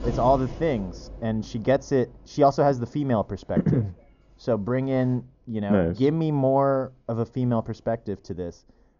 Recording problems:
high frequencies cut off; noticeable; nothing above 7 kHz
muffled; very slightly; fading above 1.5 kHz
animal sounds; noticeable; throughout; 15 dB below the speech

